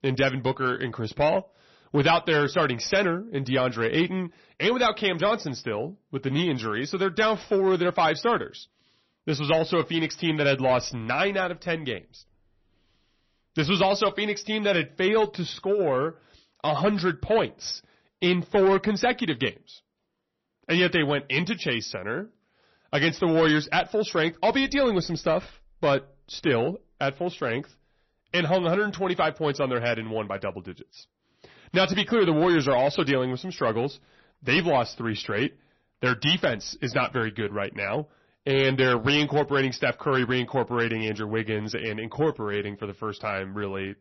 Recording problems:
distortion; slight; 10 dB below the speech
garbled, watery; slightly; nothing above 6 kHz

